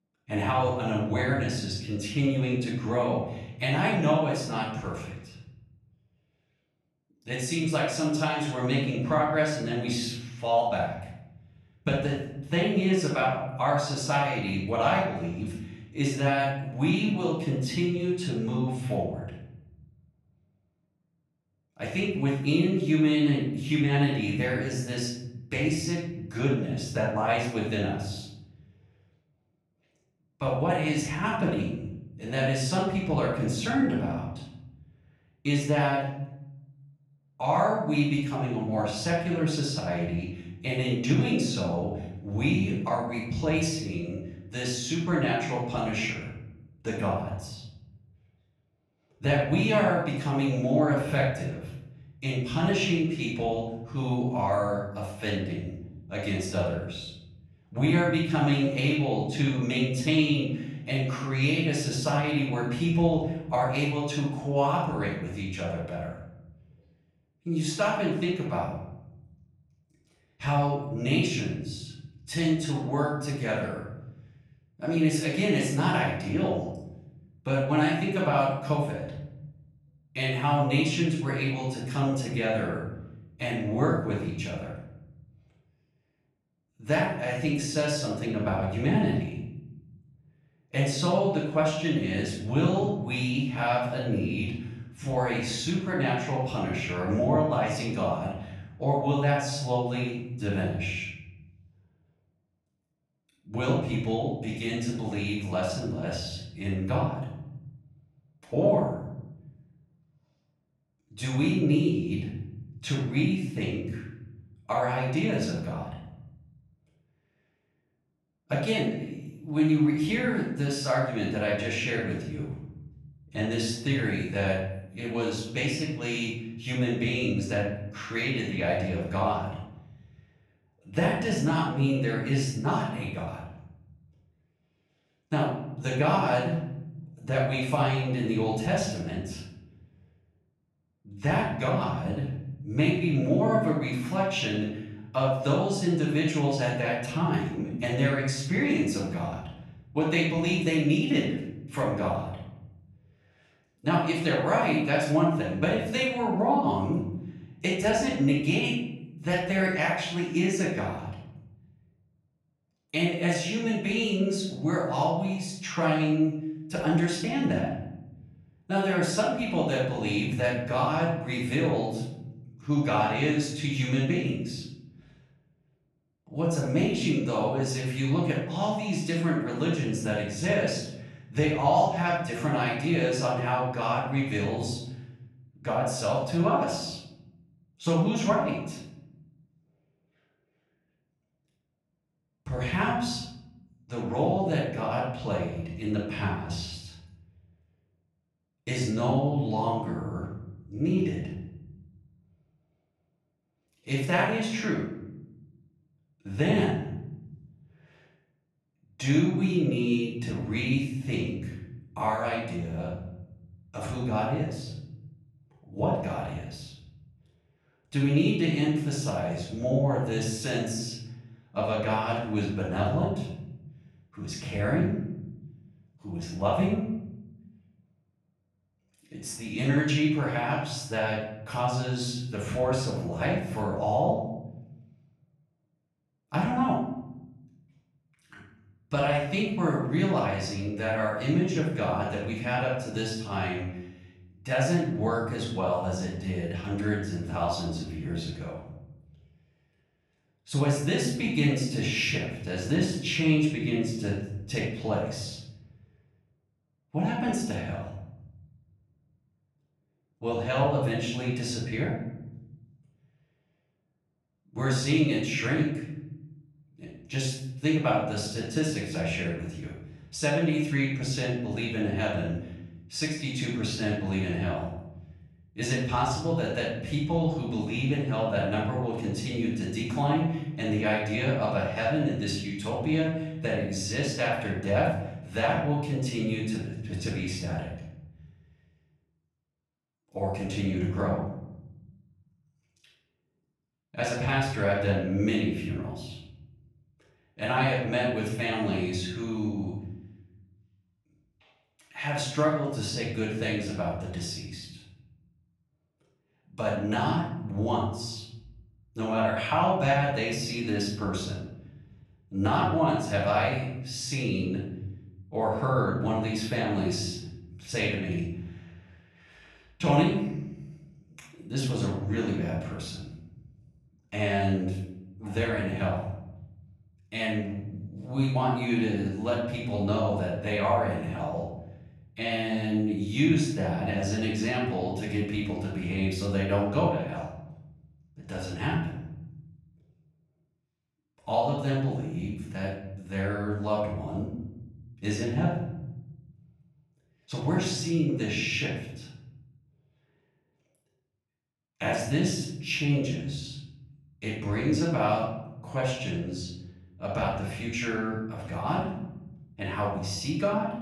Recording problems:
off-mic speech; far
room echo; noticeable; dies away in 1.2 s

